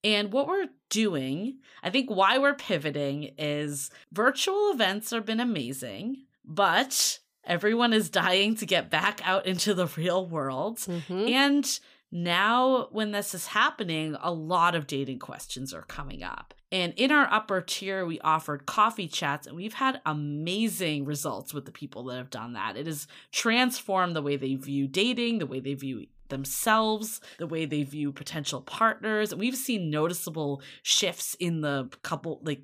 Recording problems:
none

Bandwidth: 15 kHz